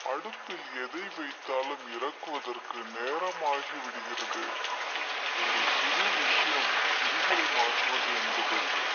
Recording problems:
thin; very; fading below 450 Hz
wrong speed and pitch; too slow and too low; 0.7 times normal speed
high frequencies cut off; noticeable; nothing above 6.5 kHz
muffled; very slightly; fading above 4 kHz
rain or running water; very loud; throughout; 8 dB above the speech

